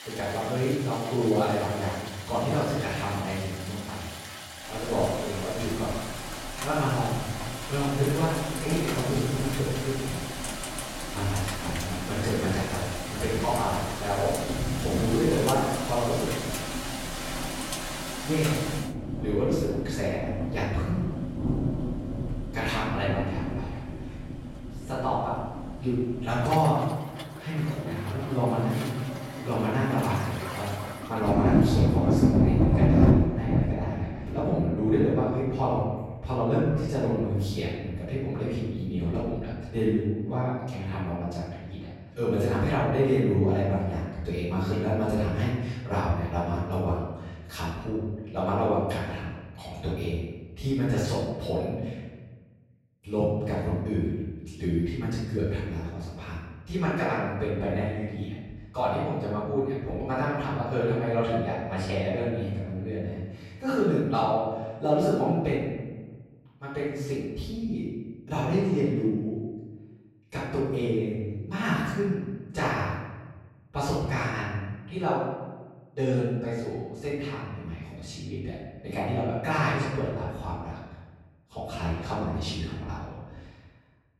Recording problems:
room echo; strong; dies away in 1.1 s
off-mic speech; far
rain or running water; loud; until 41 s; 2 dB below the speech

